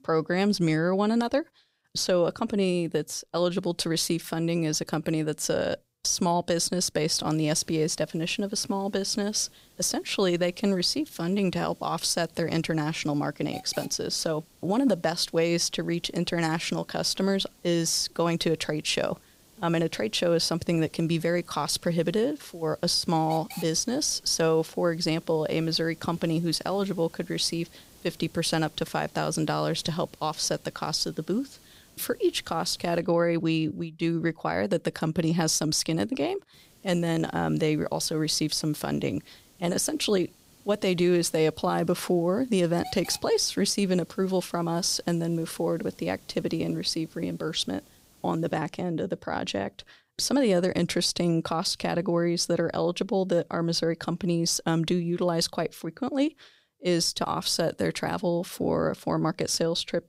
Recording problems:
hiss; faint; from 7.5 to 33 s and from 37 to 49 s; 25 dB below the speech

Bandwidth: 15.5 kHz